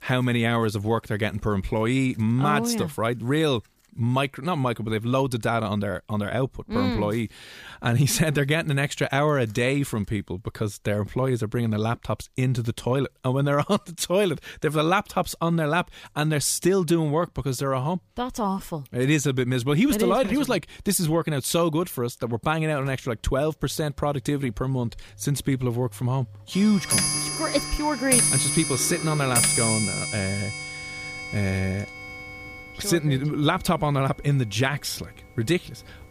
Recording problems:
household noises; loud; throughout; as loud as the speech

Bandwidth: 15 kHz